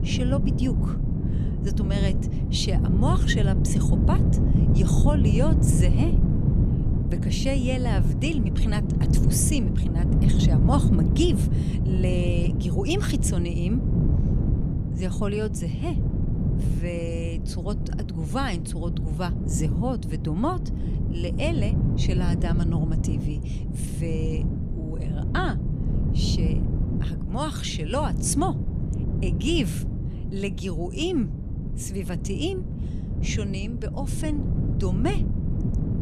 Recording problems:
wind noise on the microphone; heavy; 4 dB below the speech

